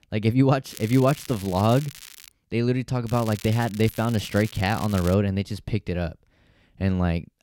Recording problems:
crackling; noticeable; from 0.5 to 2.5 s and from 3 to 5 s; 15 dB below the speech

